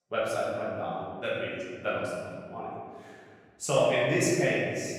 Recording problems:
room echo; strong; dies away in 1.8 s
off-mic speech; far

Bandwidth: 17 kHz